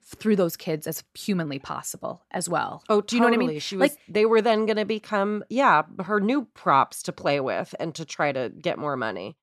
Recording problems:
none

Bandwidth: 13.5 kHz